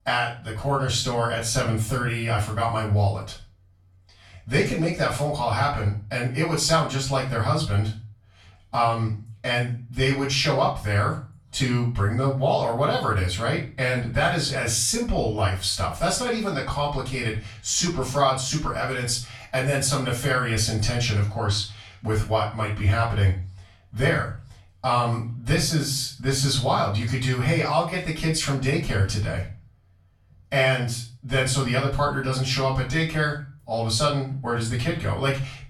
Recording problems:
off-mic speech; far
room echo; slight; dies away in 0.4 s

